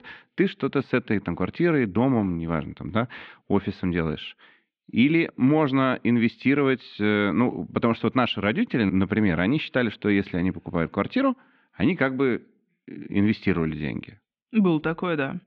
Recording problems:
muffled; very; fading above 3.5 kHz

